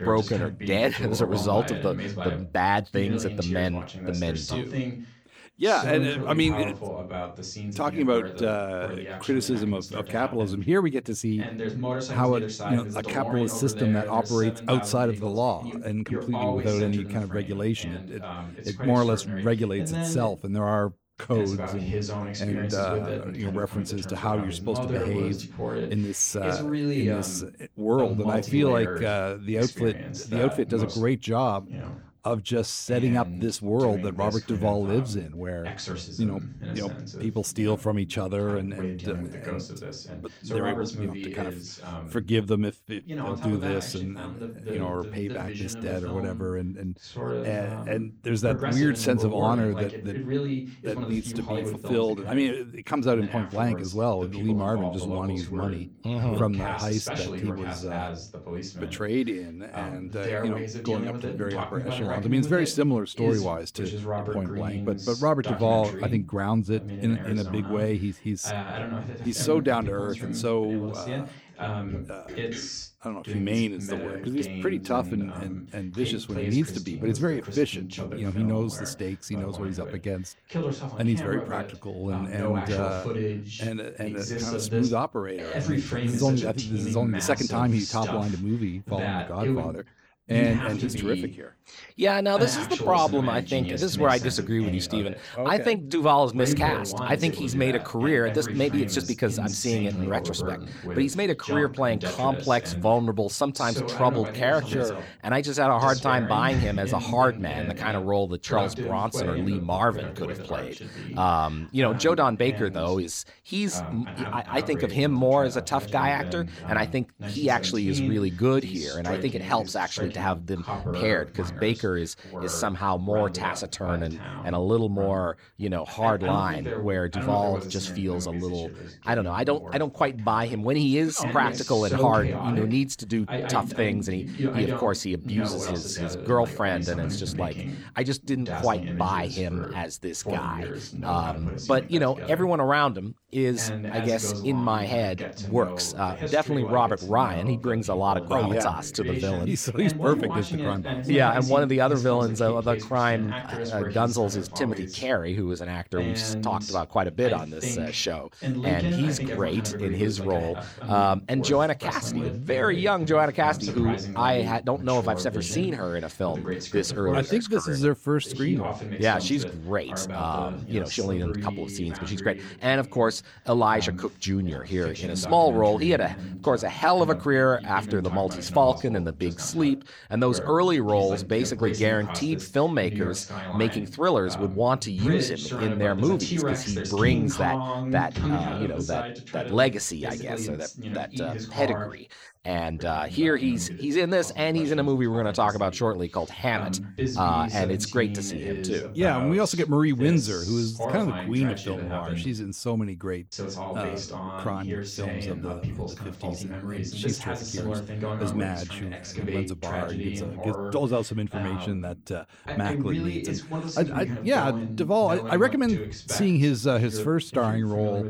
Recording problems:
voice in the background; loud; throughout; 7 dB below the speech

